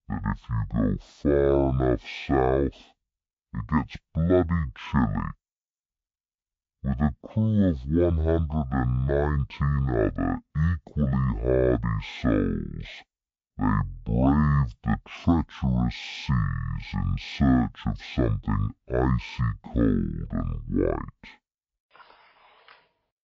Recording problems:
wrong speed and pitch; too slow and too low; 0.5 times normal speed

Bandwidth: 7.5 kHz